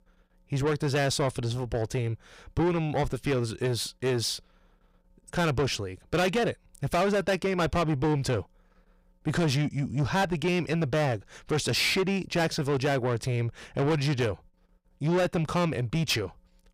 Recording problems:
distortion; heavy; 7 dB below the speech

